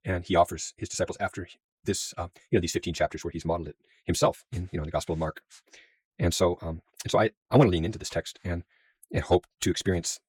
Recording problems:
wrong speed, natural pitch; too fast; 1.8 times normal speed

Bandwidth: 17.5 kHz